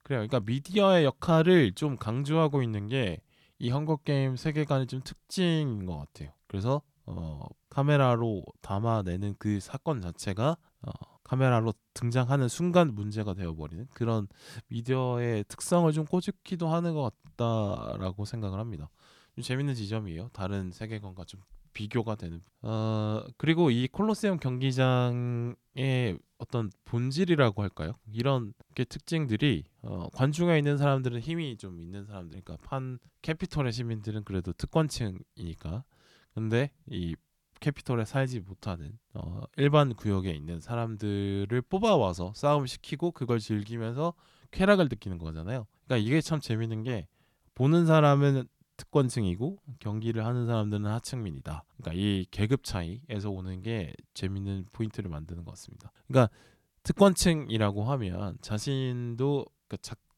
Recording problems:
none

